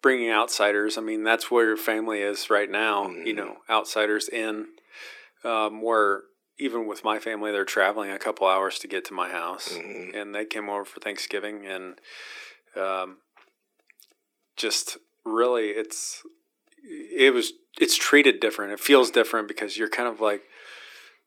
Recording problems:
thin; very; fading below 300 Hz

